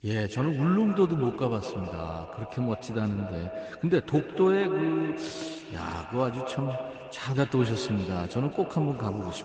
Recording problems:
echo of what is said; strong; throughout; 210 ms later, 8 dB below the speech
garbled, watery; slightly; nothing above 8 kHz

